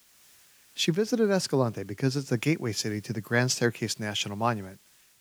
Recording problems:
hiss; faint; throughout; 30 dB below the speech

